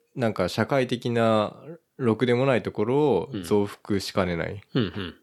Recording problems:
none

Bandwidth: 18.5 kHz